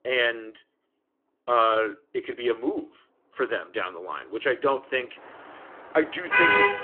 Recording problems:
phone-call audio; nothing above 3 kHz
traffic noise; very loud; throughout; 7 dB above the speech

